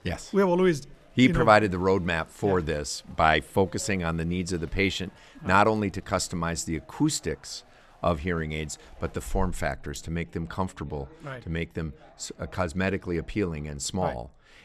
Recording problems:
chatter from many people; faint; throughout; 30 dB below the speech

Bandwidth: 13.5 kHz